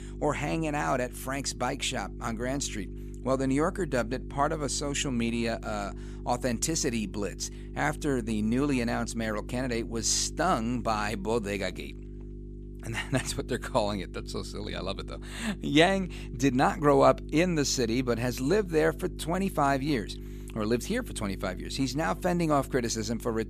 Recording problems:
electrical hum; faint; throughout; 50 Hz, 20 dB below the speech

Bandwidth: 14.5 kHz